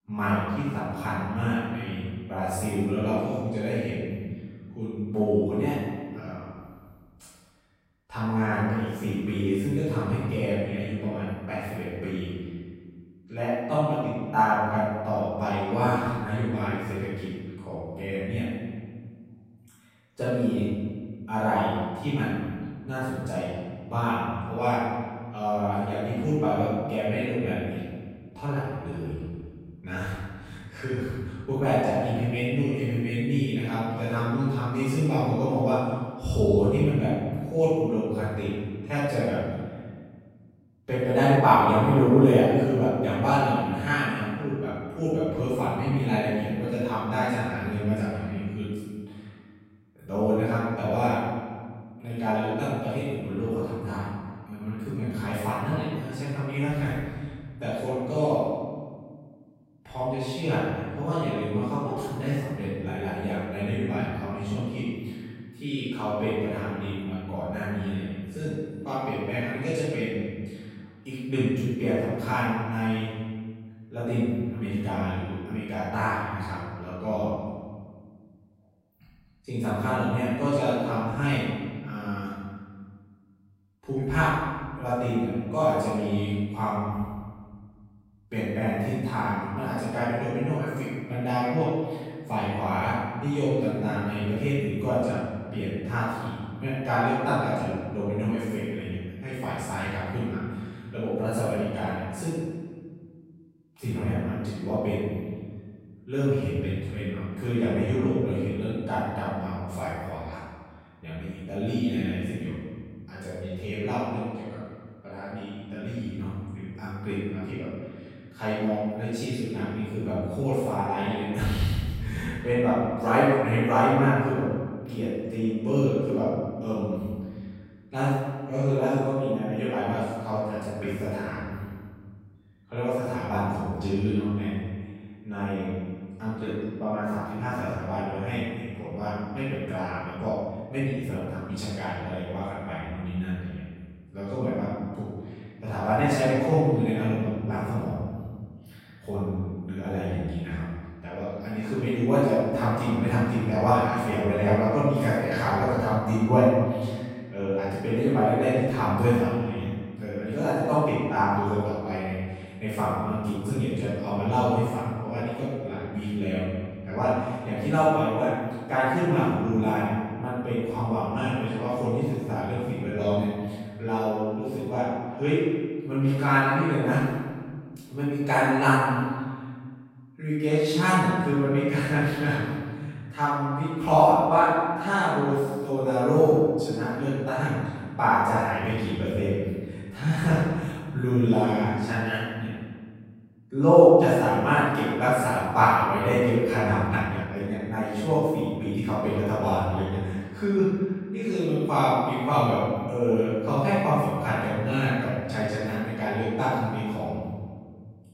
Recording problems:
room echo; strong; dies away in 1.7 s
off-mic speech; far
uneven, jittery; strongly; from 28 s to 3:19

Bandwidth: 16 kHz